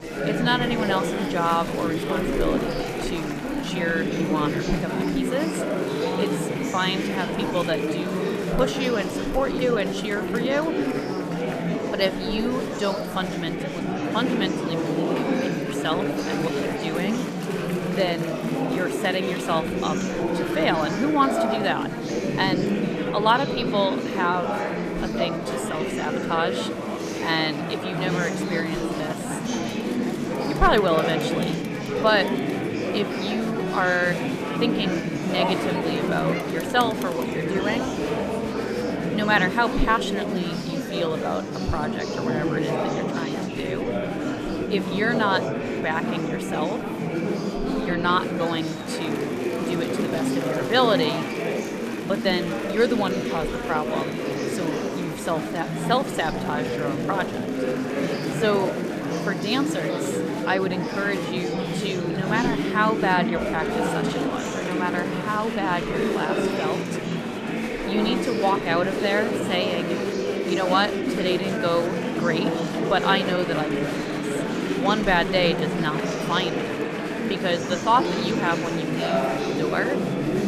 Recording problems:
murmuring crowd; very loud; throughout; as loud as the speech

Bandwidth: 14.5 kHz